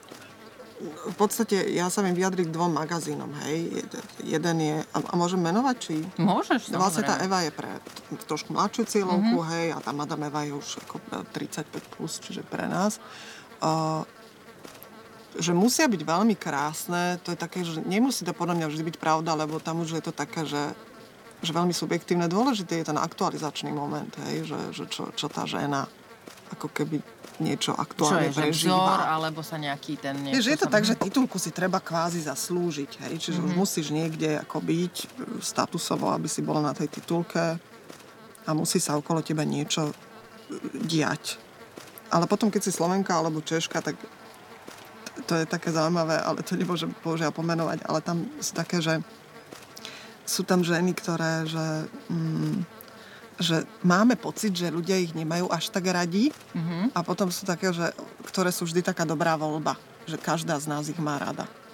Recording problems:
electrical hum; noticeable; throughout; 60 Hz, 20 dB below the speech
murmuring crowd; faint; throughout; 25 dB below the speech

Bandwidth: 17 kHz